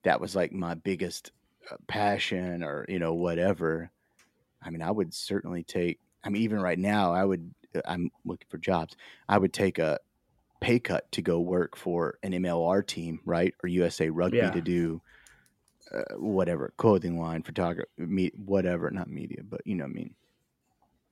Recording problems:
none

